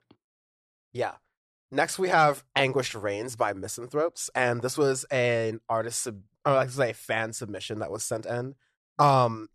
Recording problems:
none

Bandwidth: 13.5 kHz